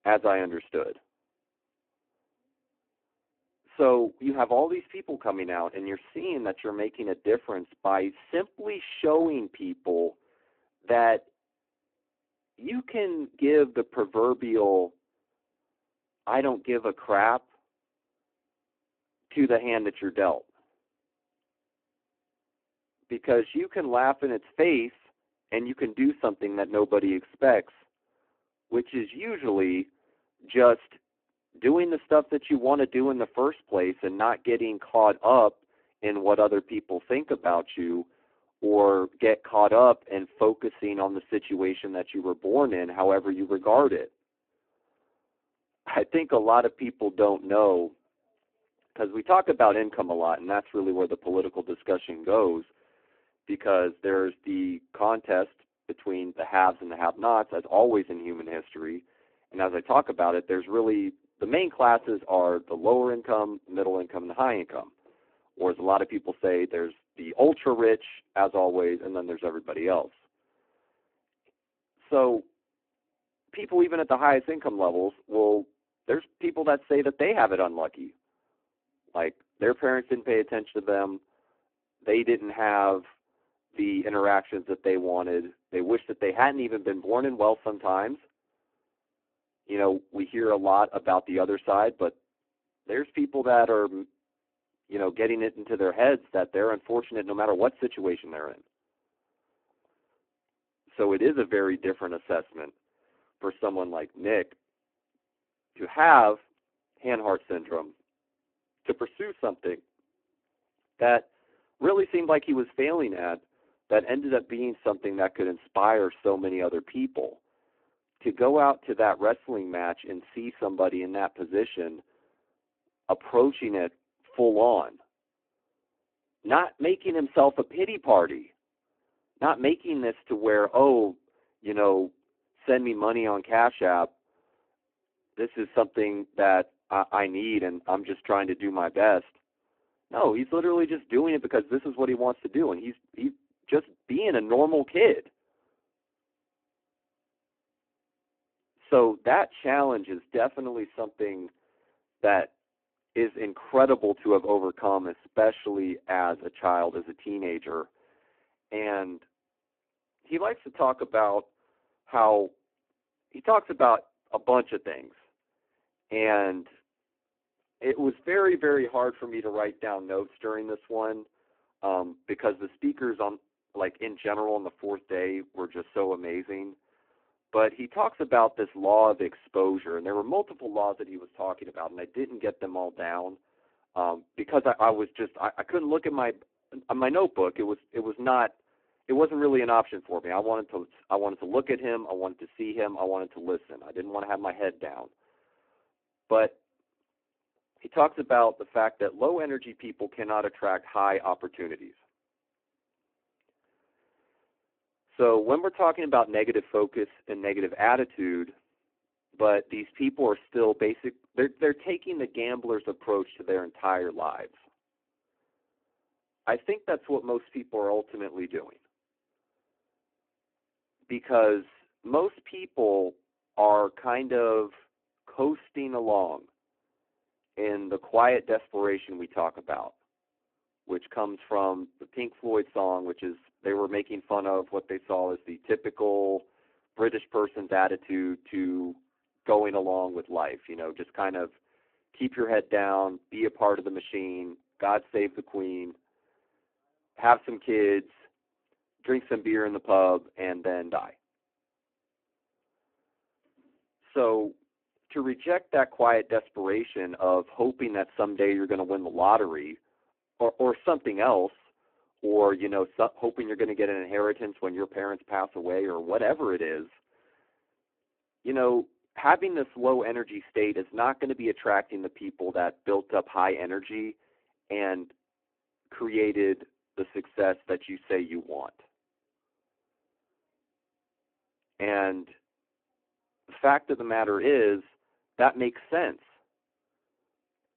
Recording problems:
phone-call audio; poor line

